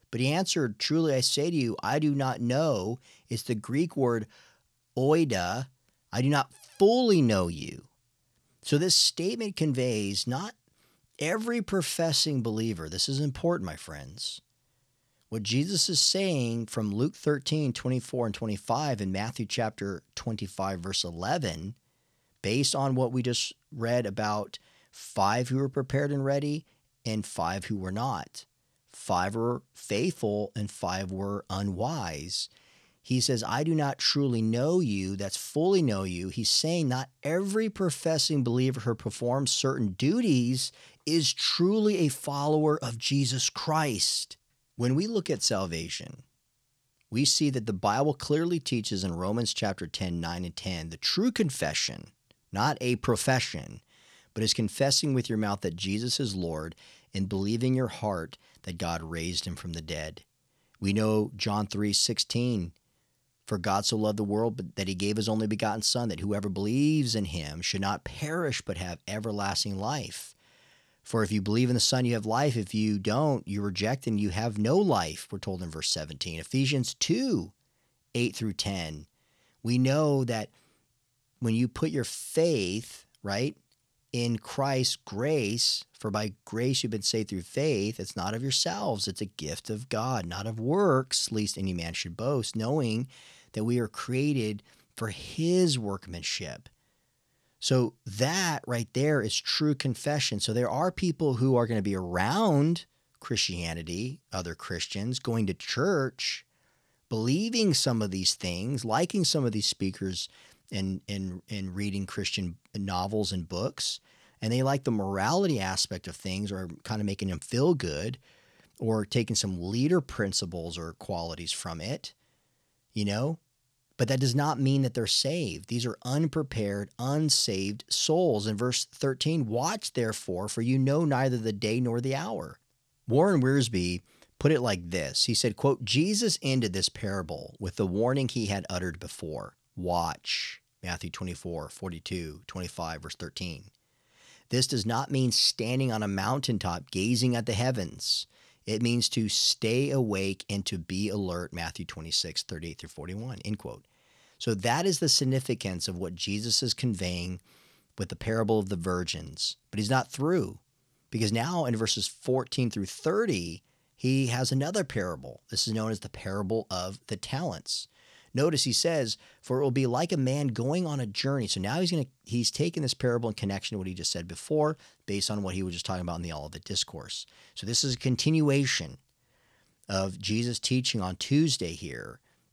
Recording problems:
none

